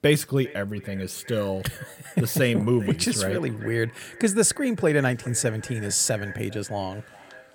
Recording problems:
echo of what is said; faint; throughout; 400 ms later, 20 dB below the speech

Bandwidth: 17.5 kHz